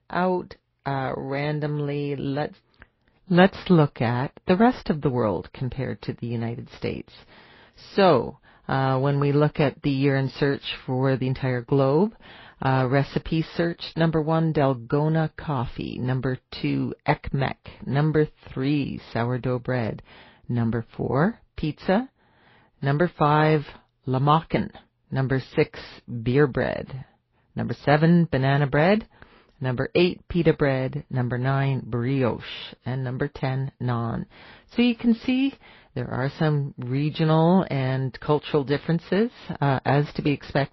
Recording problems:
garbled, watery; slightly; nothing above 5 kHz
muffled; very slightly; fading above 4.5 kHz

